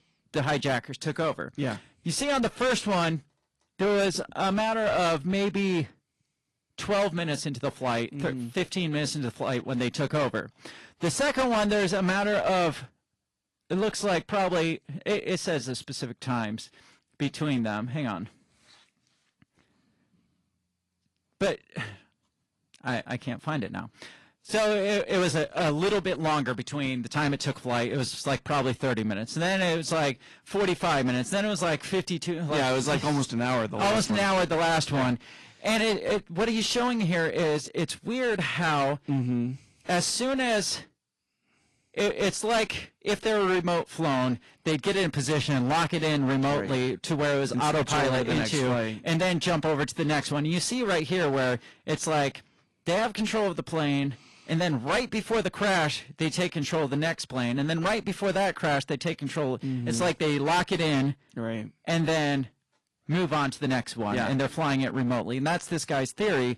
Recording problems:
distortion; heavy; 16% of the sound clipped
garbled, watery; slightly; nothing above 11 kHz

